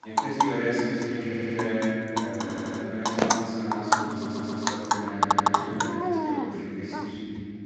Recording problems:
room echo; strong; dies away in 3 s
off-mic speech; far
garbled, watery; slightly; nothing above 7.5 kHz
animal sounds; very loud; throughout; 2 dB above the speech
audio stuttering; 4 times, first at 1.5 s

